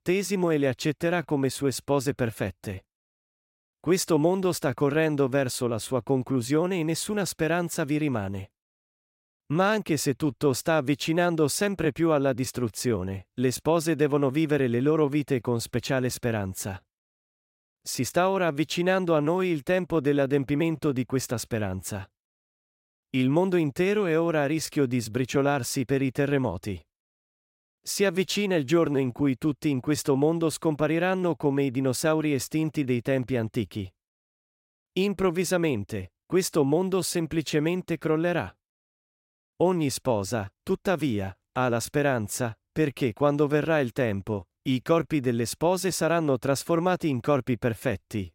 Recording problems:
none

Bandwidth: 16 kHz